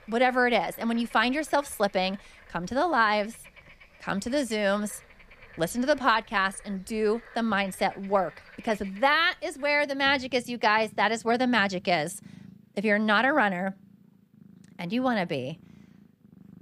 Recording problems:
animal sounds; faint; throughout; 25 dB below the speech

